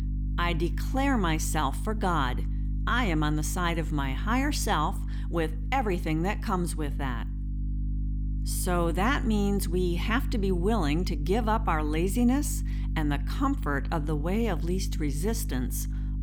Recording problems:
electrical hum; noticeable; throughout; 50 Hz, 15 dB below the speech

